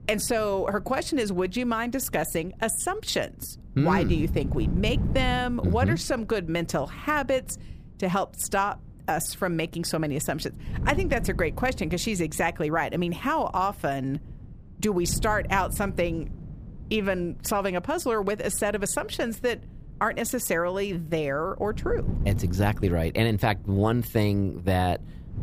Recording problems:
wind noise on the microphone; occasional gusts; 20 dB below the speech

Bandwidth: 15 kHz